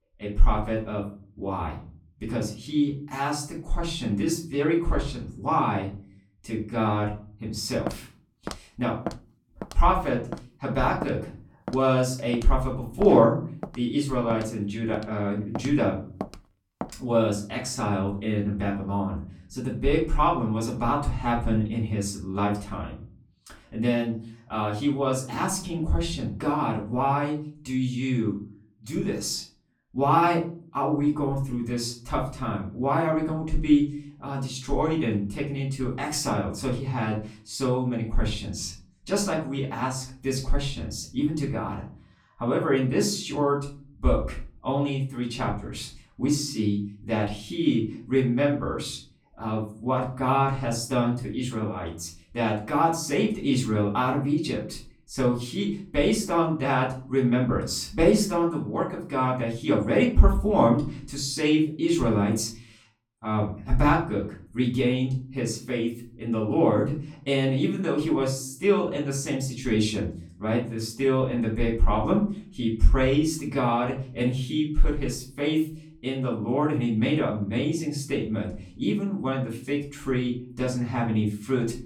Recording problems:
off-mic speech; far
room echo; slight; dies away in 0.4 s
footsteps; noticeable; from 8 to 17 s; peak 10 dB below the speech

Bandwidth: 17 kHz